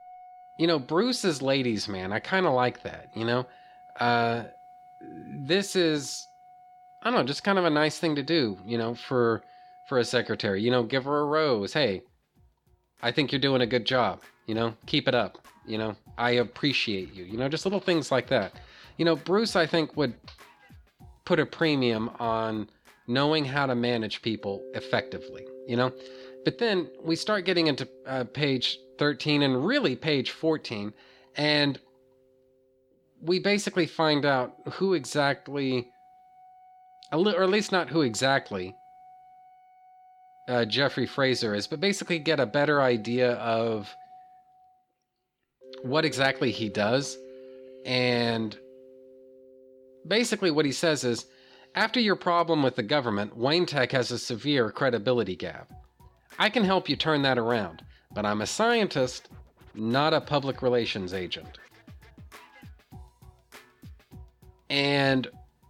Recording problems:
background music; faint; throughout; 25 dB below the speech

